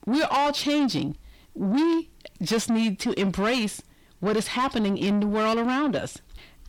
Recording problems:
distortion; heavy; 8 dB below the speech

